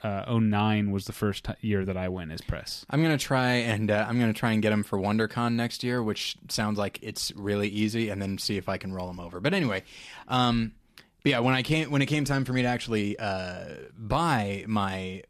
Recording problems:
none

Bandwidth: 14 kHz